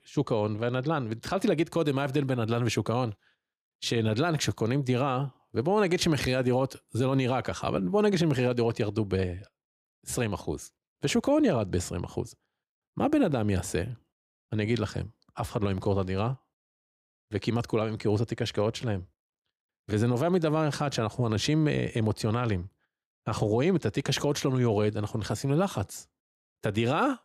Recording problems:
none

